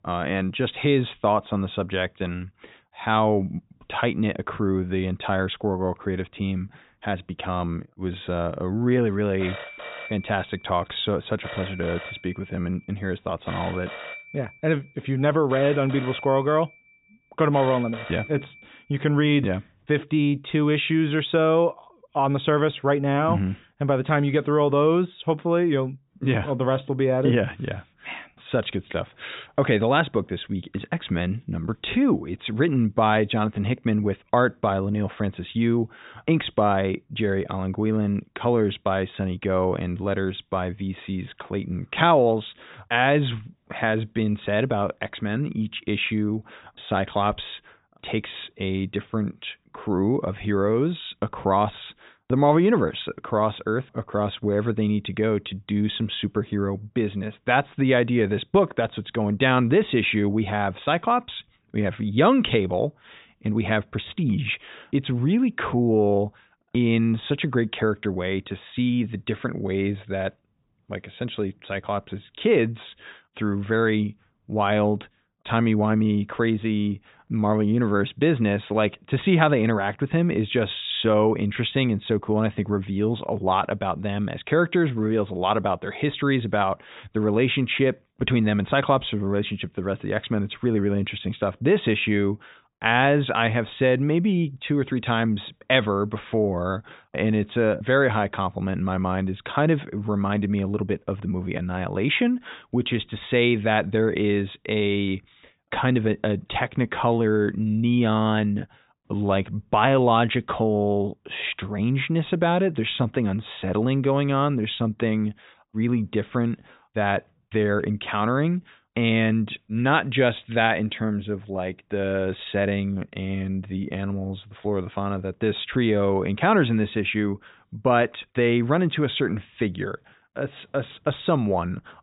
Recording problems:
high frequencies cut off; severe; nothing above 4 kHz
phone ringing; faint; from 9.5 to 19 s; peak 10 dB below the speech

